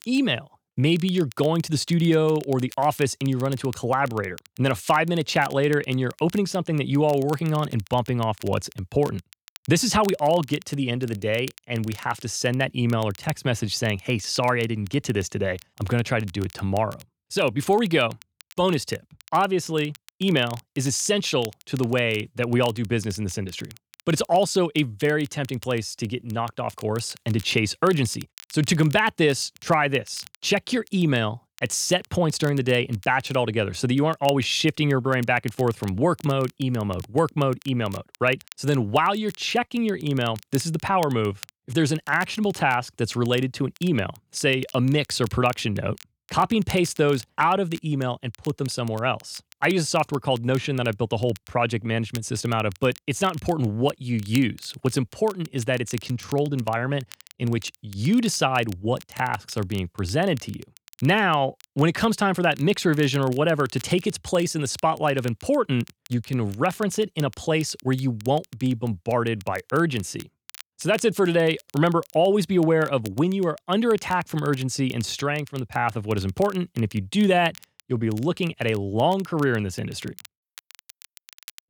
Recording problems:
crackle, like an old record; faint; 20 dB below the speech

